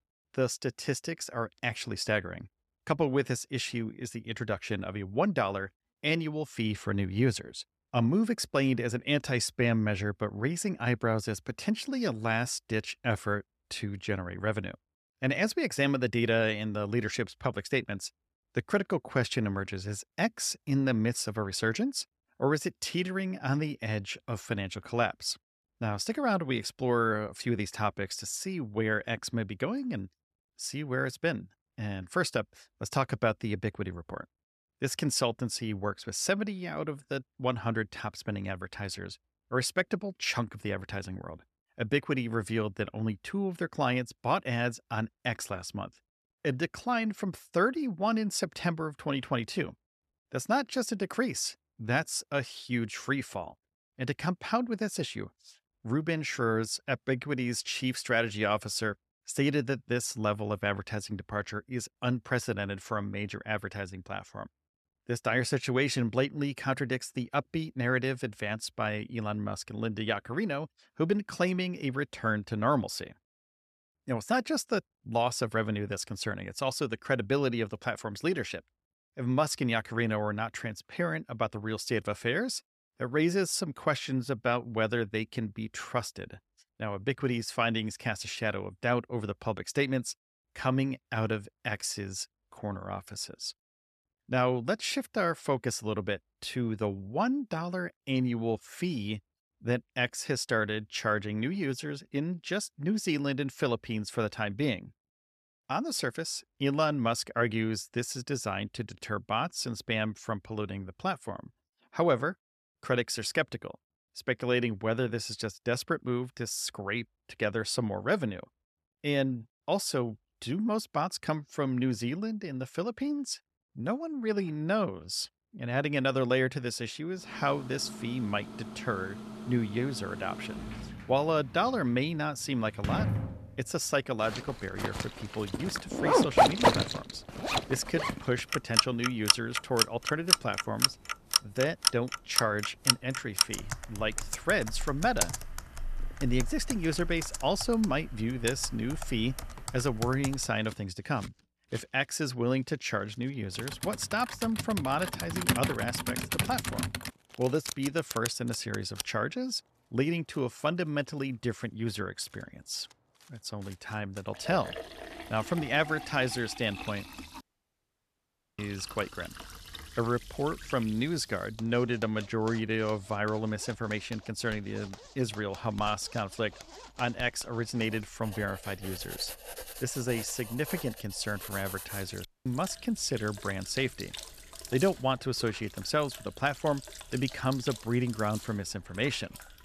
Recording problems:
household noises; loud; from 2:07 on; 1 dB below the speech
audio cutting out; at 2:47 for 1 s and at 3:02

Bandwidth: 14 kHz